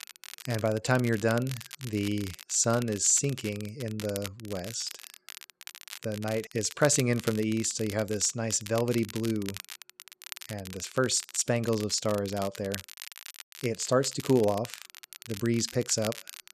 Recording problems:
crackle, like an old record; noticeable; 15 dB below the speech

